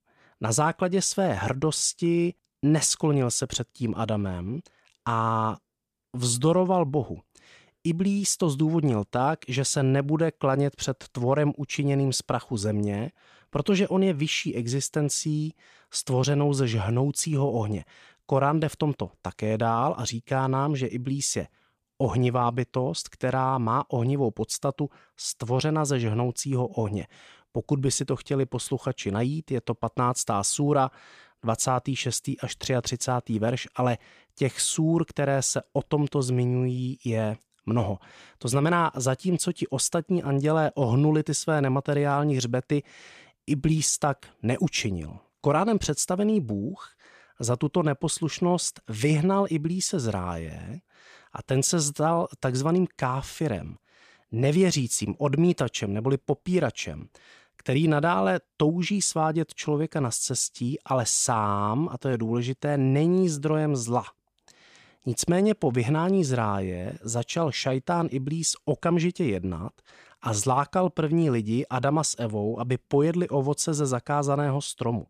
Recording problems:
none

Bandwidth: 14.5 kHz